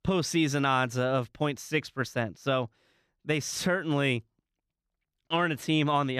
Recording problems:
abrupt cut into speech; at the end

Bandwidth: 14.5 kHz